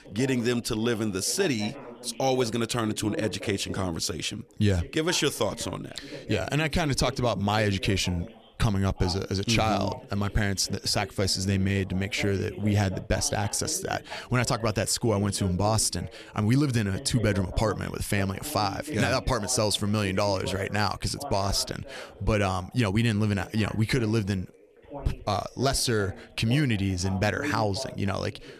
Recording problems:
background chatter; noticeable; throughout; 2 voices, 15 dB below the speech

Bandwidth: 14 kHz